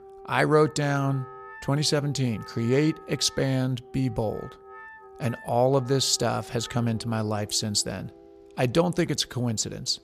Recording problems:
background music; faint; throughout; 20 dB below the speech

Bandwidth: 14.5 kHz